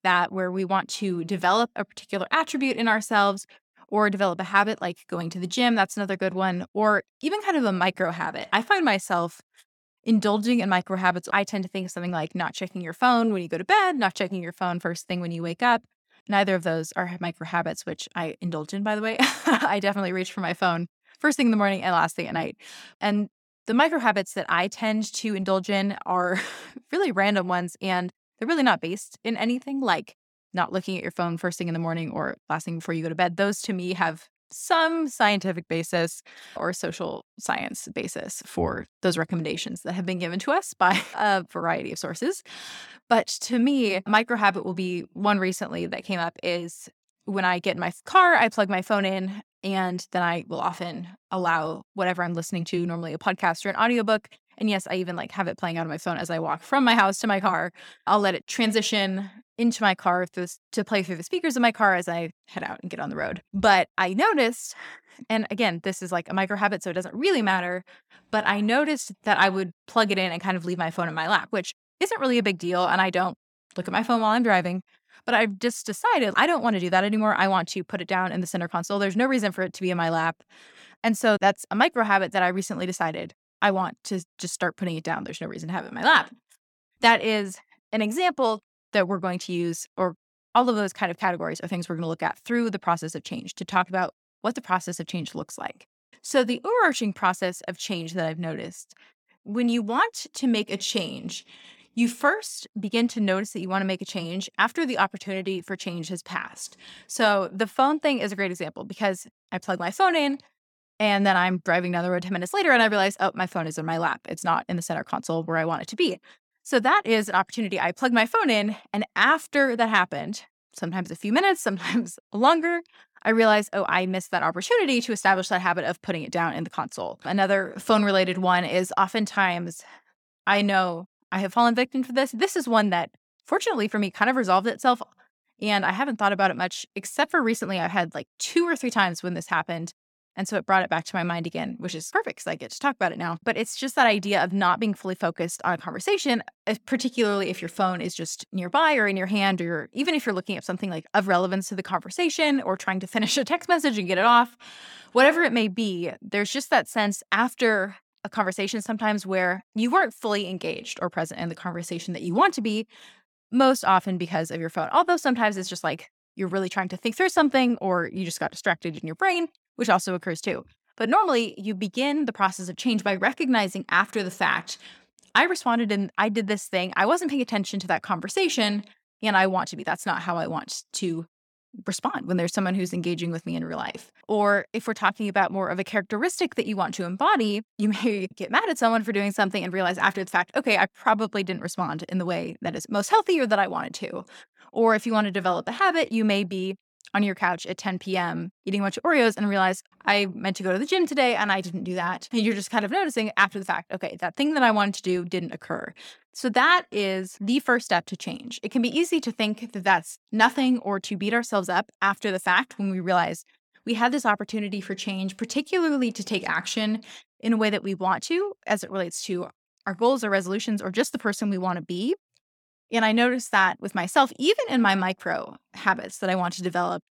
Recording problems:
none

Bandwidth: 18 kHz